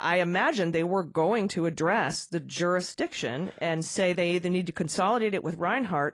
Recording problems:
garbled, watery; slightly; nothing above 10 kHz
abrupt cut into speech; at the start

